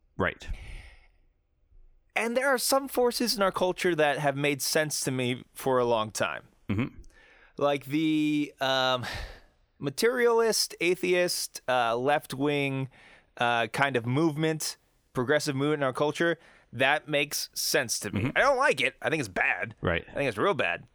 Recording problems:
none

